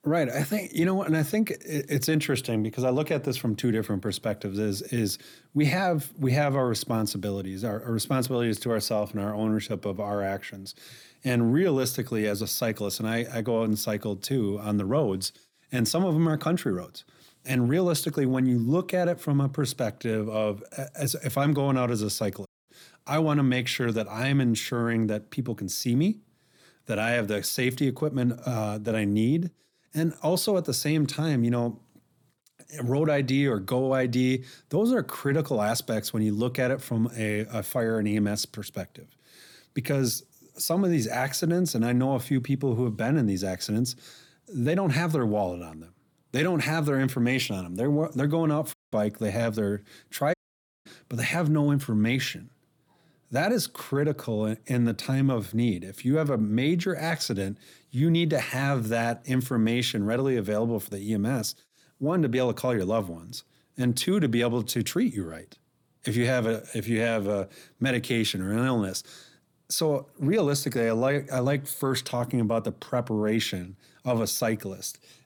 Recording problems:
audio cutting out; at 22 s, at 49 s and at 50 s for 0.5 s

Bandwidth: 18.5 kHz